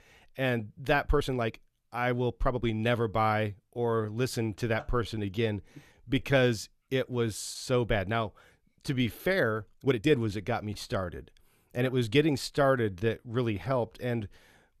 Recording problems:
uneven, jittery; strongly; from 1 to 14 s

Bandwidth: 14 kHz